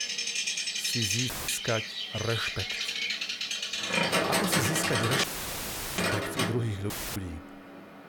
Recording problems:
animal sounds; very loud; throughout; 5 dB above the speech
audio cutting out; filled with static; at 1.5 s, at 5 s for 0.5 s and at 7 s

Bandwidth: 18 kHz